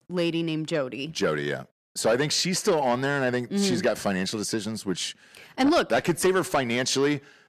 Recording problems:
distortion; slight; 10 dB below the speech

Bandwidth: 14.5 kHz